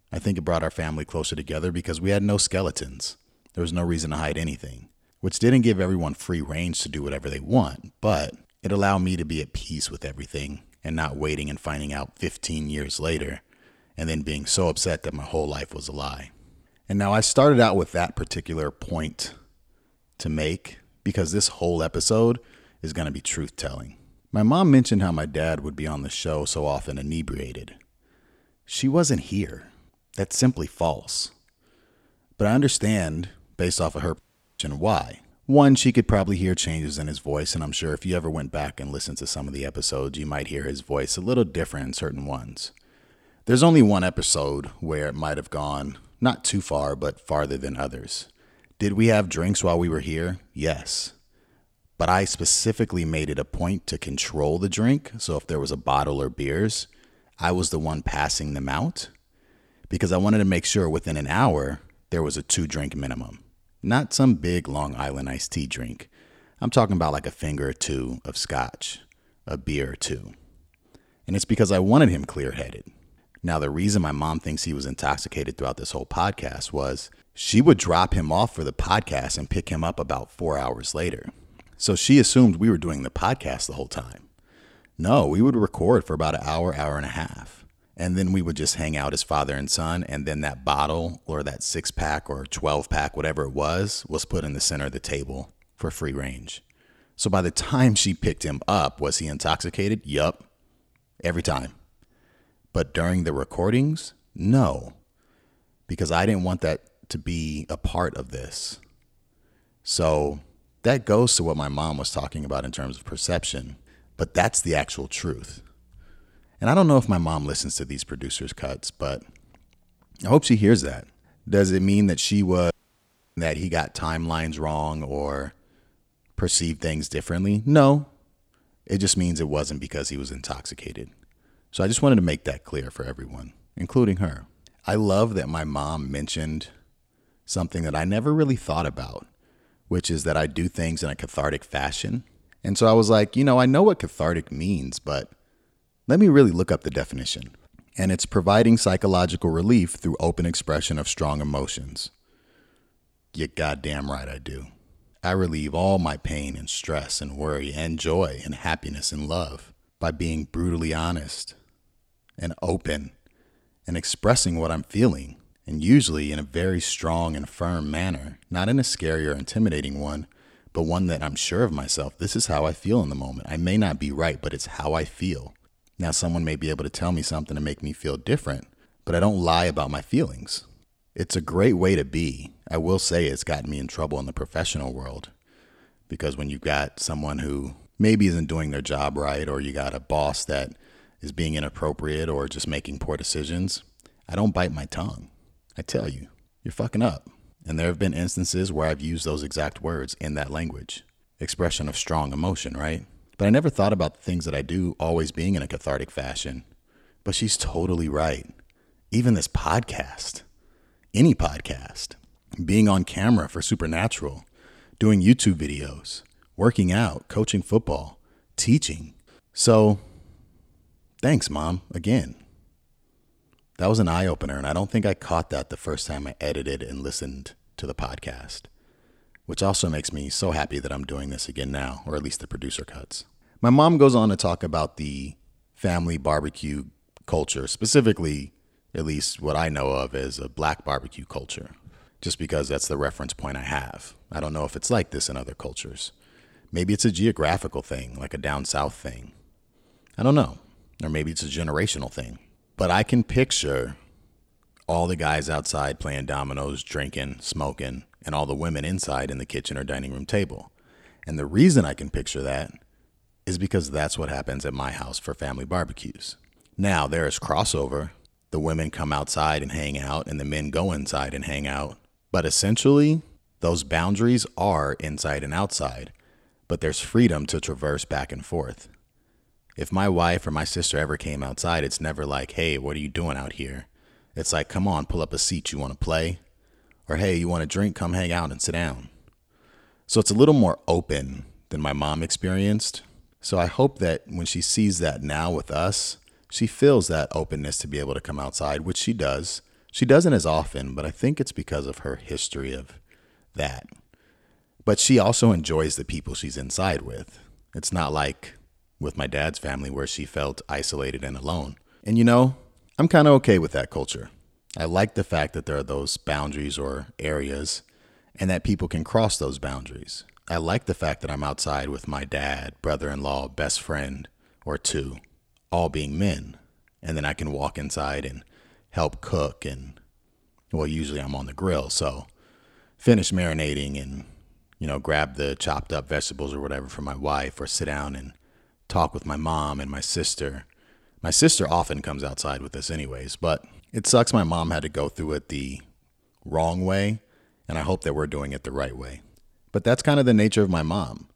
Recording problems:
audio cutting out; at 34 s and at 2:03 for 0.5 s

